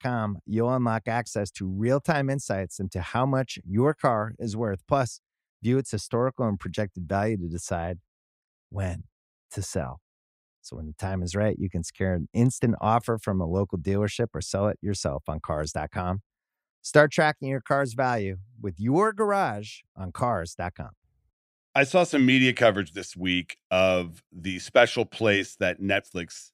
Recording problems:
none

